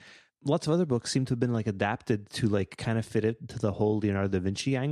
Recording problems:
abrupt cut into speech; at the end

